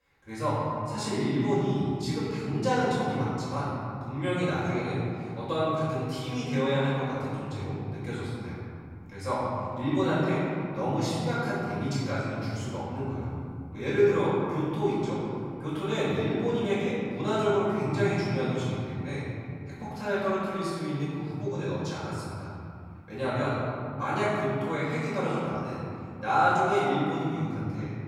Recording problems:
room echo; strong; dies away in 2.5 s
off-mic speech; far

